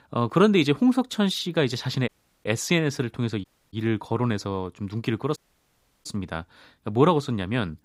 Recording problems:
audio cutting out; at 2 s, at 3.5 s and at 5.5 s for 0.5 s

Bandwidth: 15.5 kHz